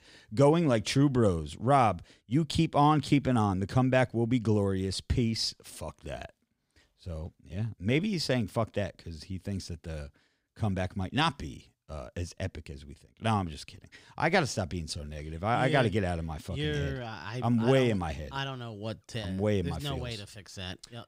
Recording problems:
none

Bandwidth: 15.5 kHz